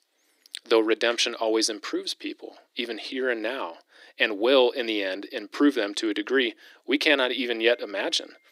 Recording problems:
thin; somewhat; fading below 300 Hz

